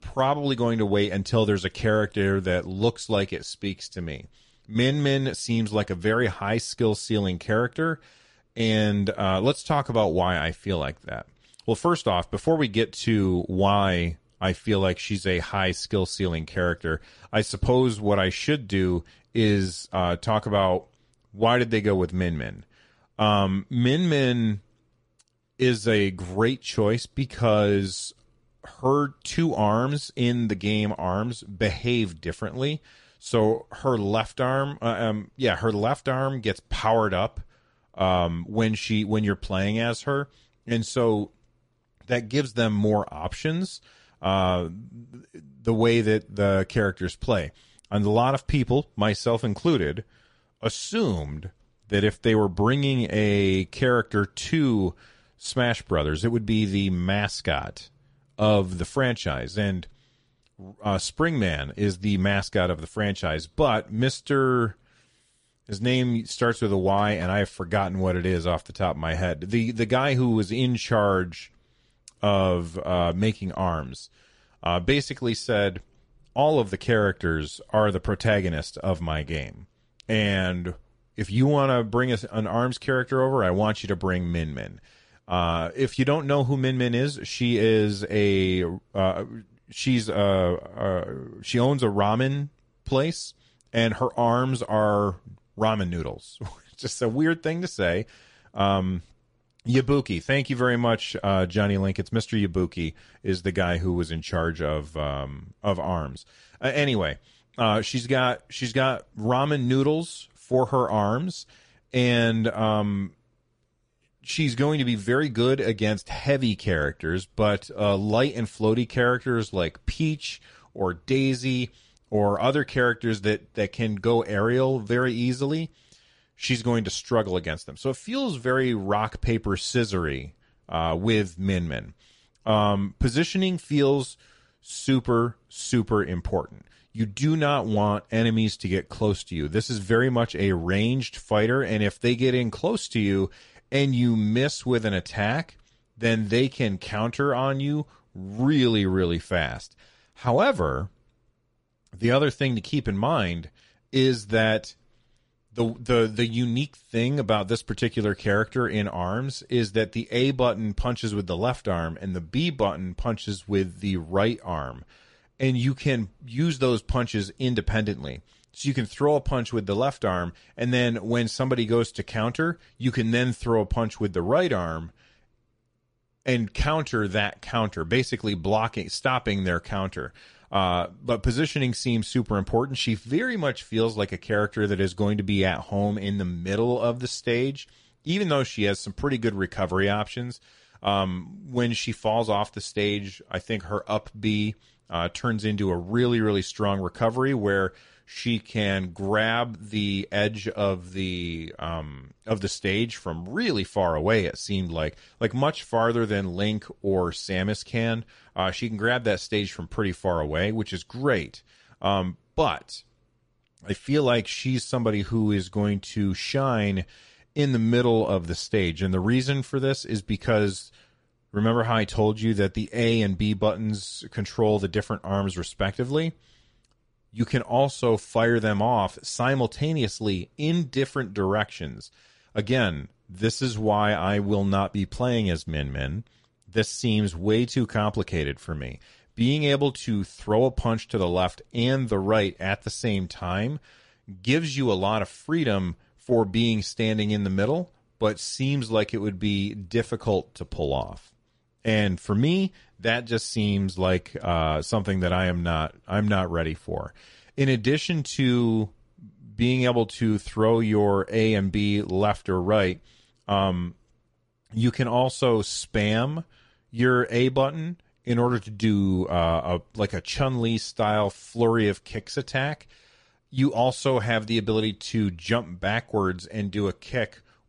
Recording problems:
garbled, watery; slightly; nothing above 10 kHz

